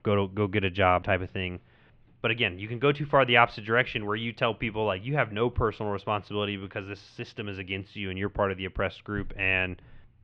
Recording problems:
muffled; slightly; fading above 3.5 kHz

